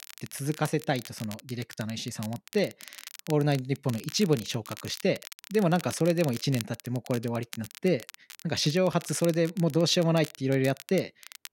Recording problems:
crackle, like an old record; noticeable; 15 dB below the speech

